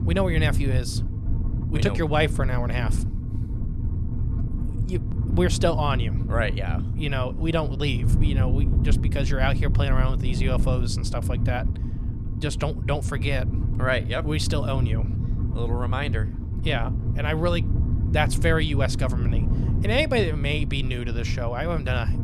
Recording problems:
wind noise on the microphone; occasional gusts; from 3.5 to 11 s and from 15 s on; 20 dB below the speech
low rumble; noticeable; throughout; 10 dB below the speech

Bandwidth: 14.5 kHz